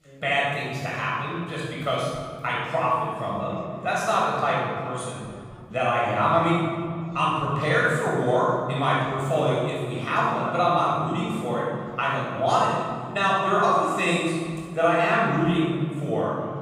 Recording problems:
room echo; strong; dies away in 2.1 s
off-mic speech; far
background chatter; faint; throughout; 2 voices, 25 dB below the speech

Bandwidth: 15.5 kHz